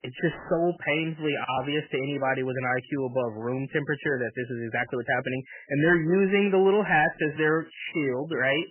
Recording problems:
garbled, watery; badly; nothing above 3 kHz
distortion; slight; 10 dB below the speech

